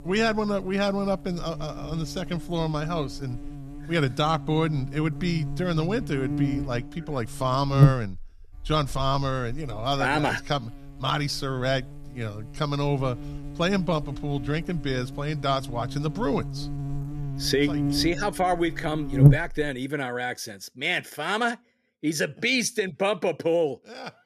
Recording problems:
electrical hum; loud; until 20 s; 50 Hz, 10 dB below the speech

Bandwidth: 14 kHz